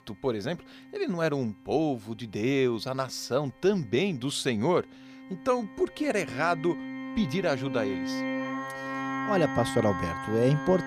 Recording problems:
background music; loud; throughout; 6 dB below the speech

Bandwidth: 15 kHz